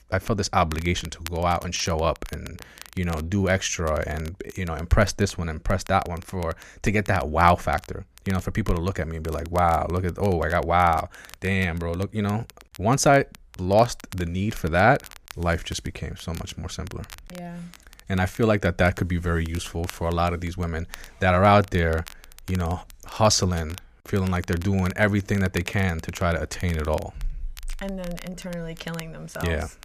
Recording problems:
crackle, like an old record; faint; 20 dB below the speech

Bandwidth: 14.5 kHz